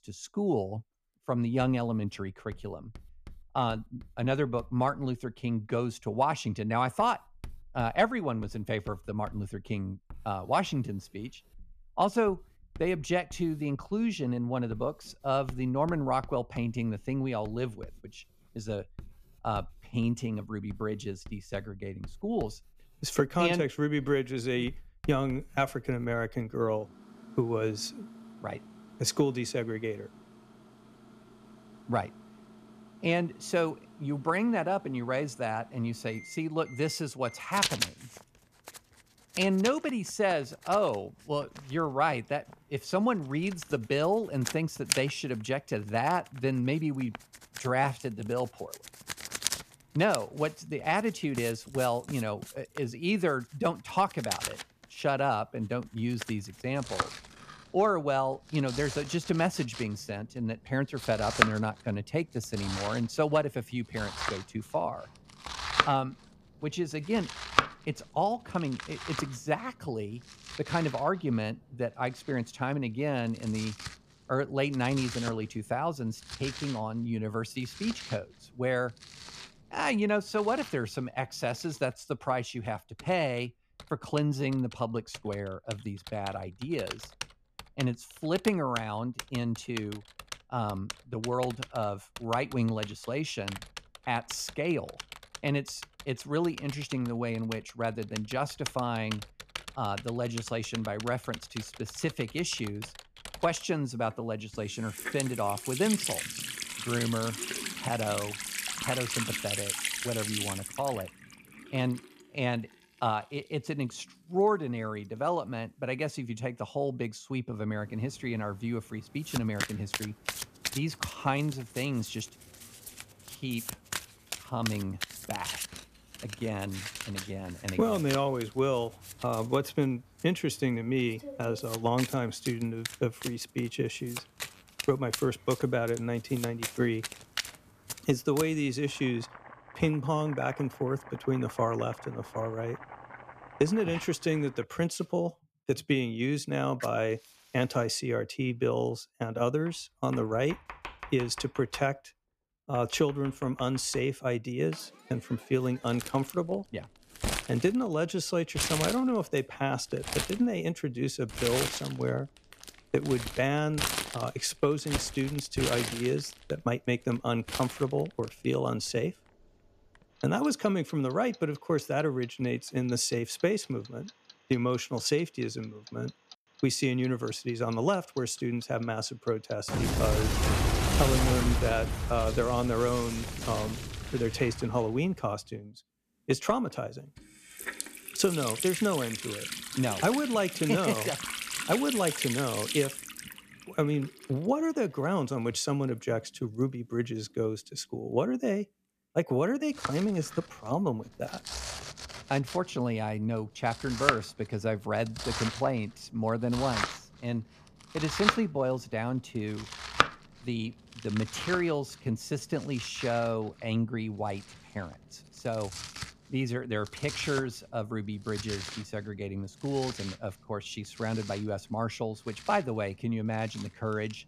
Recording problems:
household noises; loud; throughout; 5 dB below the speech

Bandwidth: 14.5 kHz